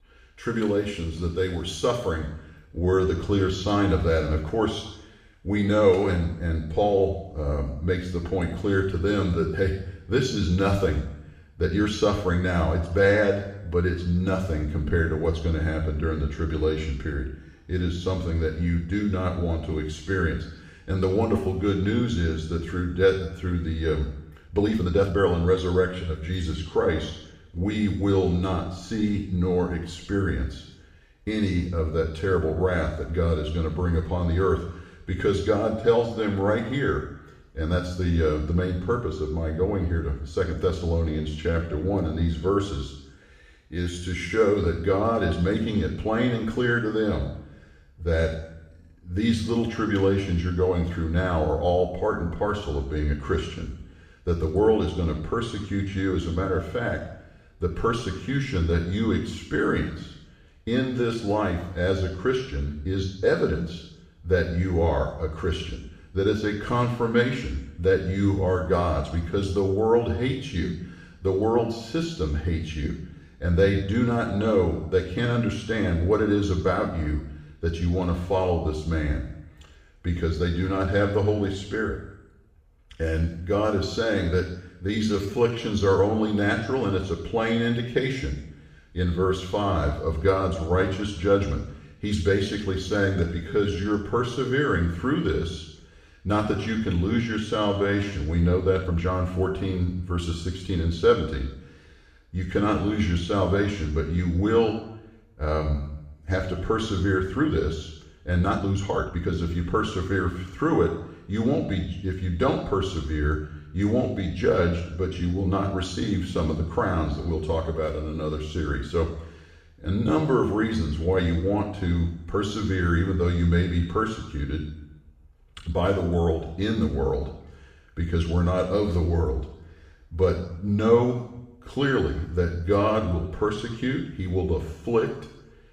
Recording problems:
off-mic speech; far
room echo; noticeable; dies away in 0.8 s
uneven, jittery; strongly; from 2.5 s to 1:49

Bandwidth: 15 kHz